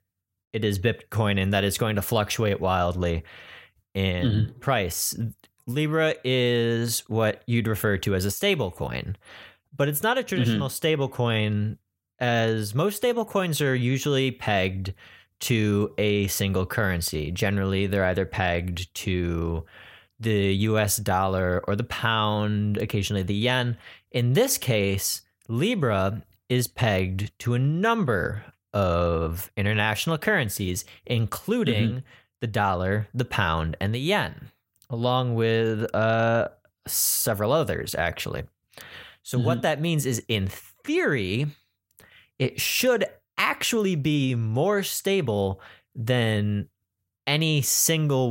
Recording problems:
abrupt cut into speech; at the end

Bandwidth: 16 kHz